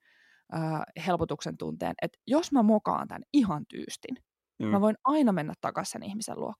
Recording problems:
none

